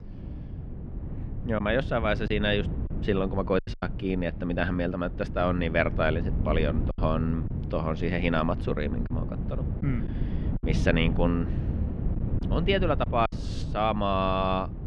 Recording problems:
muffled; slightly; fading above 3 kHz
wind noise on the microphone; occasional gusts; 15 dB below the speech
choppy; very; from 1.5 to 4 s, from 7 to 9 s and at 13 s; 6% of the speech affected

